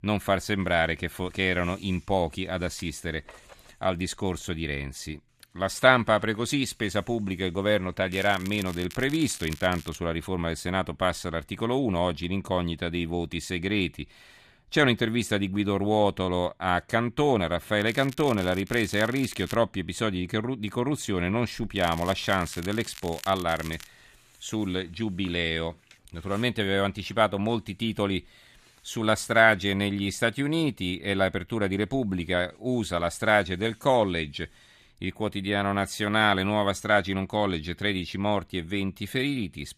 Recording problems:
crackling; noticeable; from 8 to 10 s, from 18 to 20 s and from 22 to 24 s; 15 dB below the speech

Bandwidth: 14.5 kHz